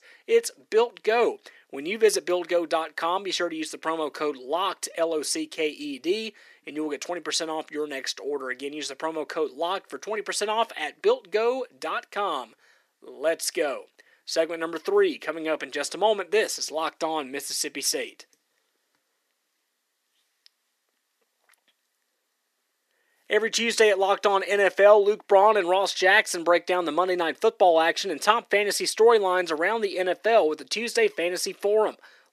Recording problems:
thin; very; fading below 350 Hz

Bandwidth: 14.5 kHz